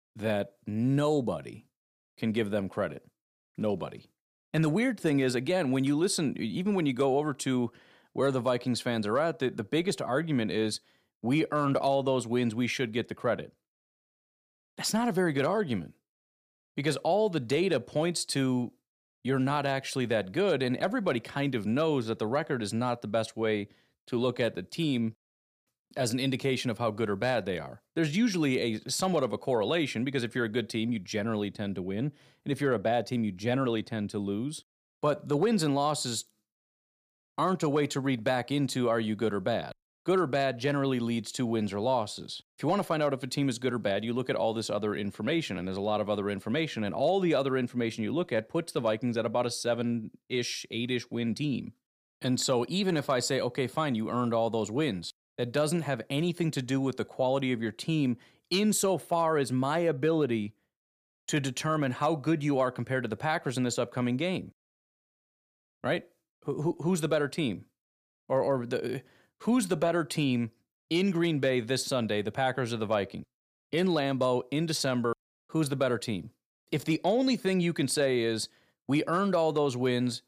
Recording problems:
none

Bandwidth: 15 kHz